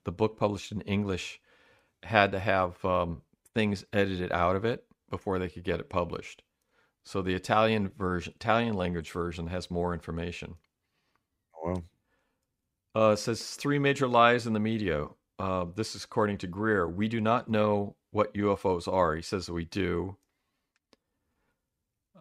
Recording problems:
none

